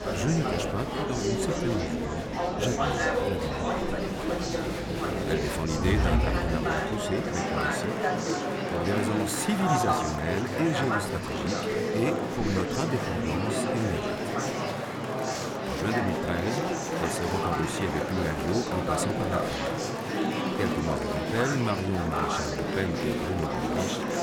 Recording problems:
murmuring crowd; very loud; throughout; 3 dB above the speech

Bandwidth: 17.5 kHz